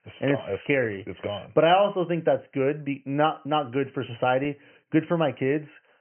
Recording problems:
high frequencies cut off; severe; nothing above 3 kHz

